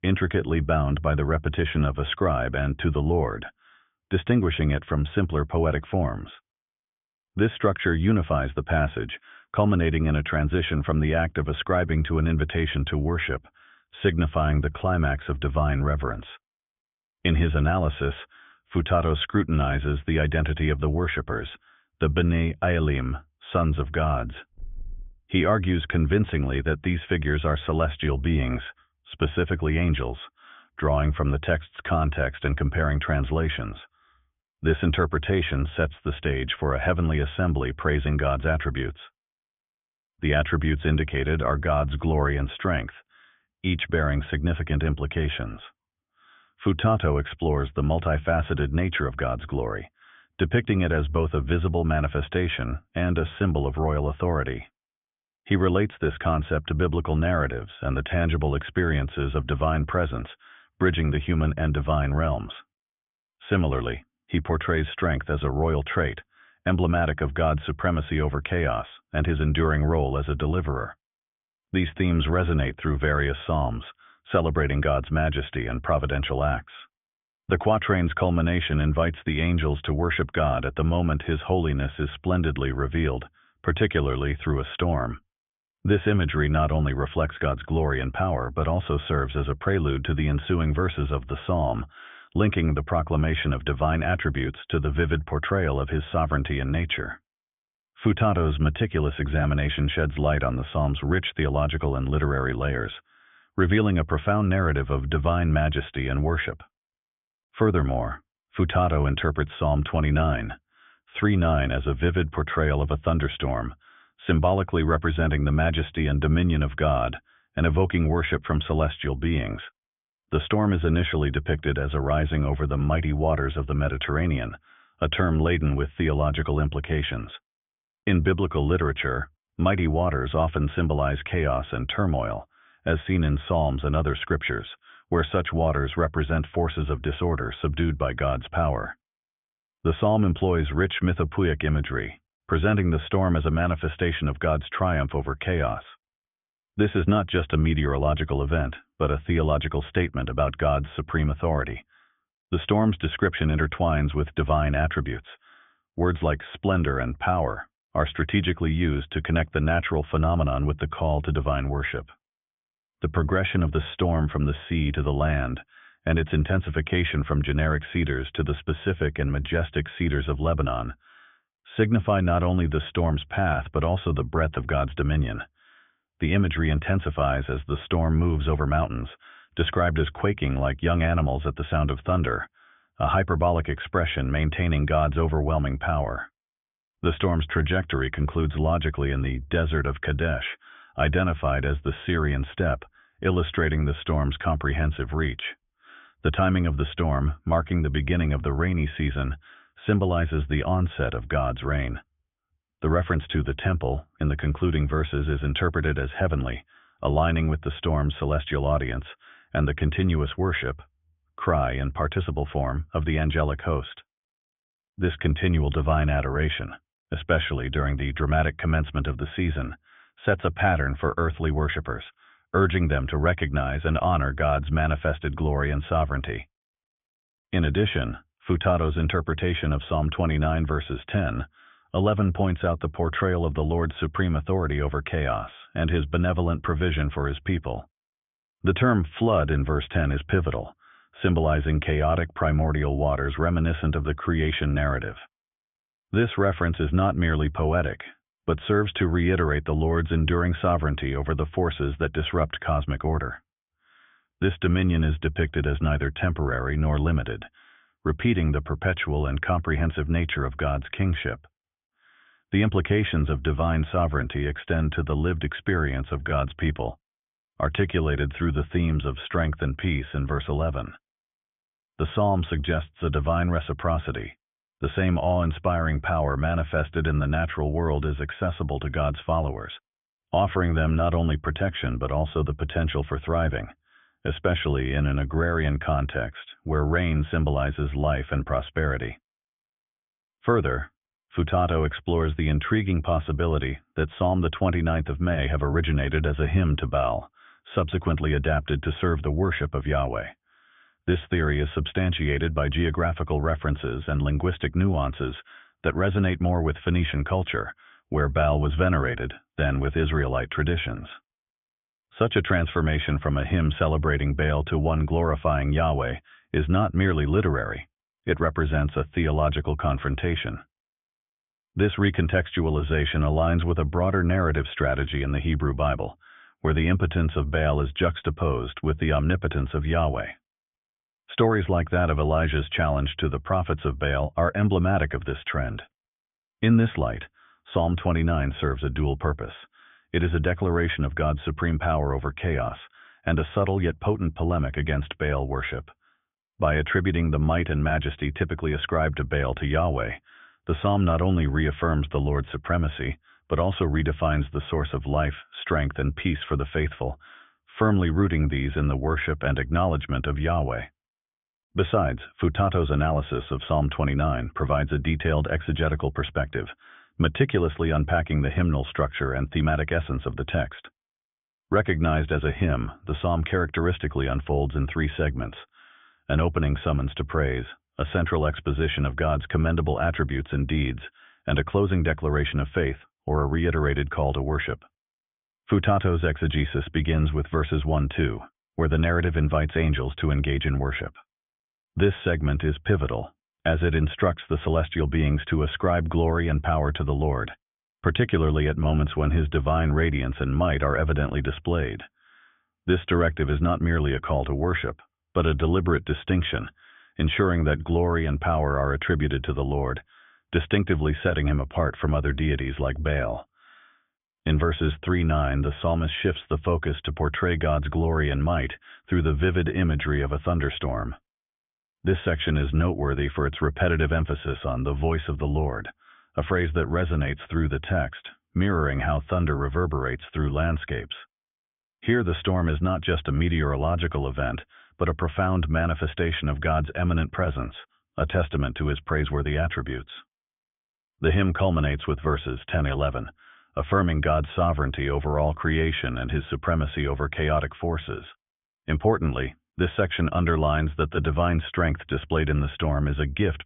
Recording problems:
high frequencies cut off; severe; nothing above 3.5 kHz

